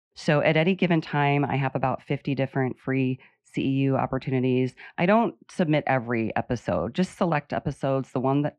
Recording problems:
muffled; very; fading above 2.5 kHz

